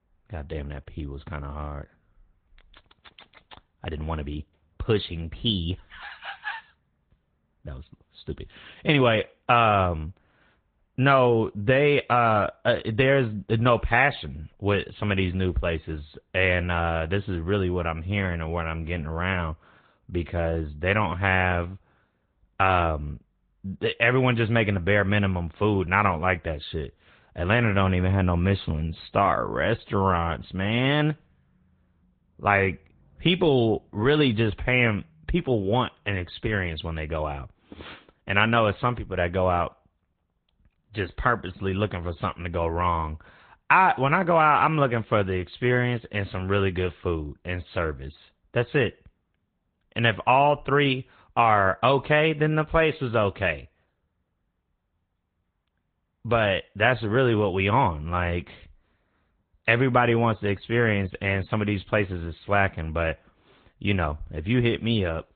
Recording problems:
high frequencies cut off; severe; nothing above 3.5 kHz
garbled, watery; slightly

